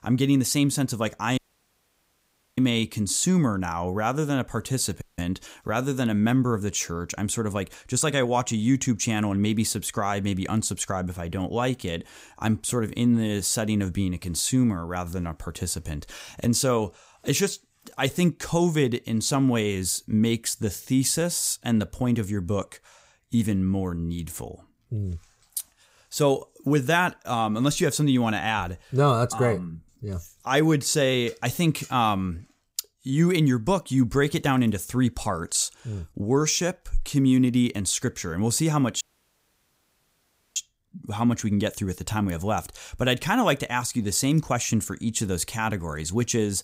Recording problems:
audio cutting out; at 1.5 s for 1 s, at 5 s and at 39 s for 1.5 s

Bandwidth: 15.5 kHz